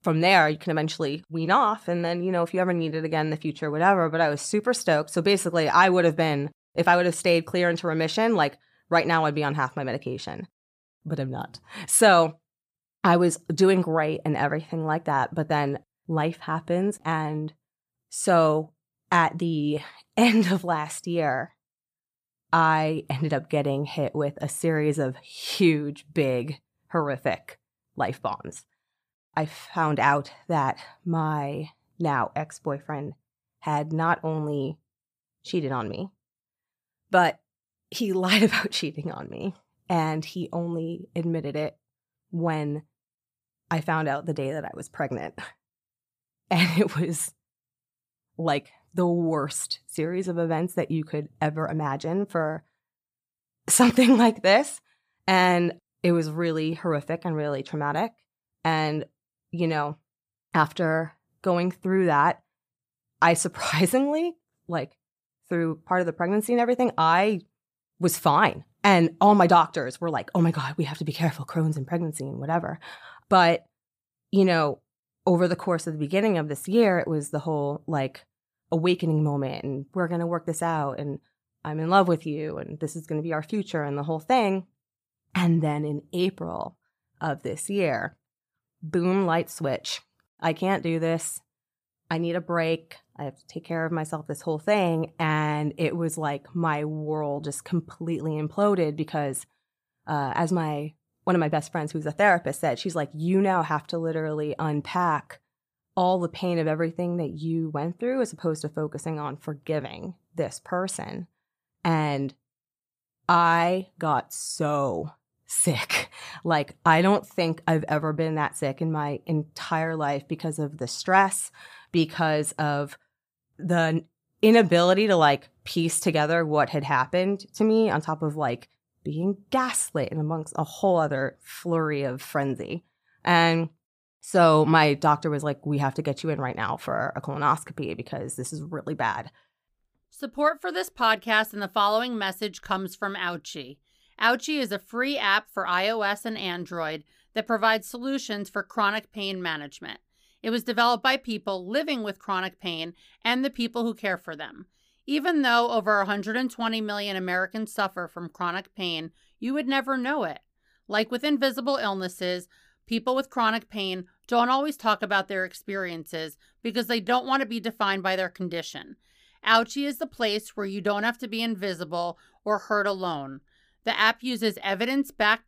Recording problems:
none

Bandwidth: 15 kHz